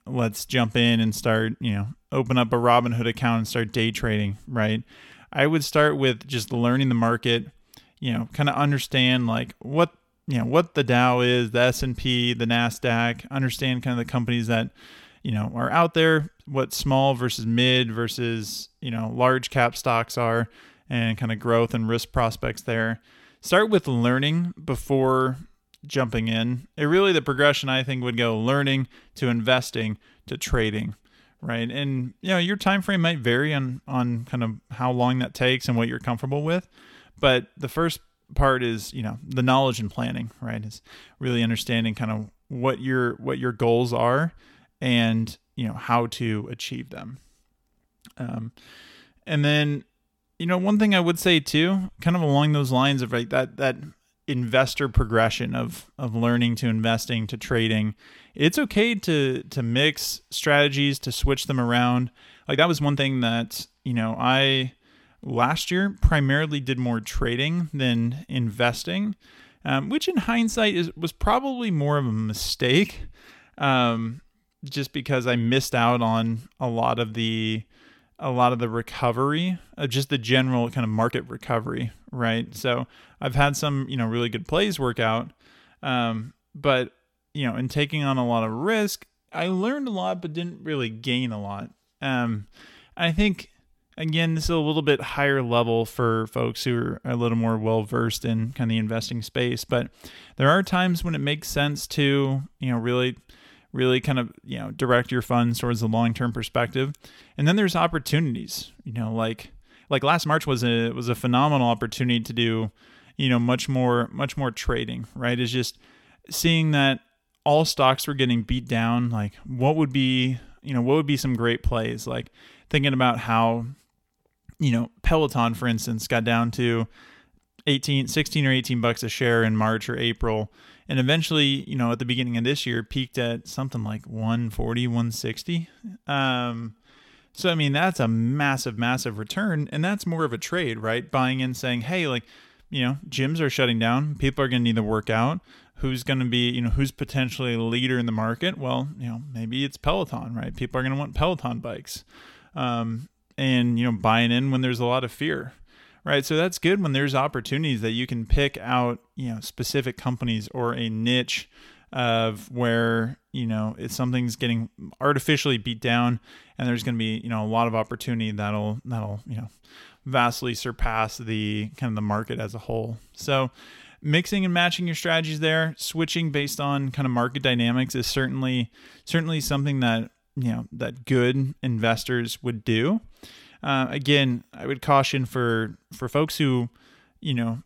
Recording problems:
uneven, jittery; strongly; from 15 s to 3:06

